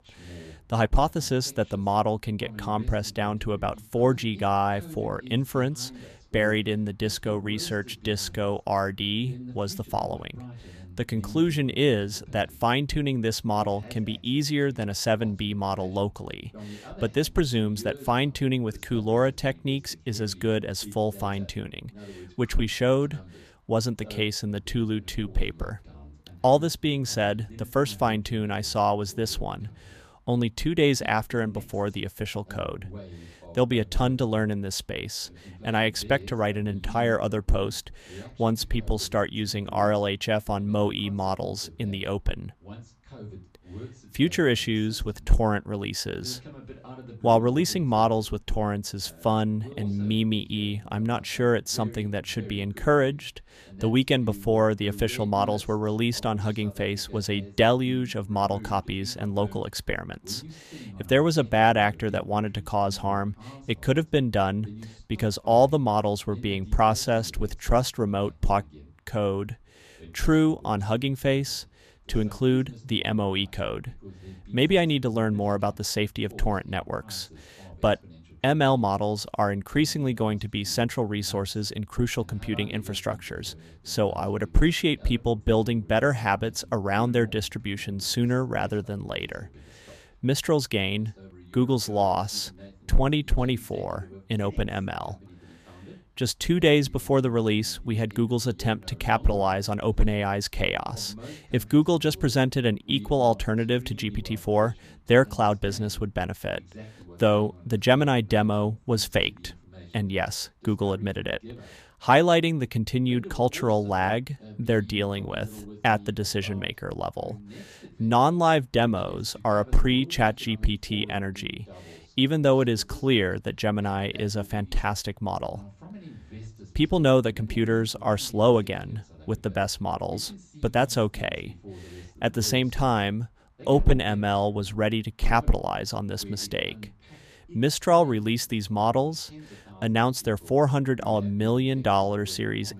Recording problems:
voice in the background; faint; throughout; 20 dB below the speech

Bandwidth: 14.5 kHz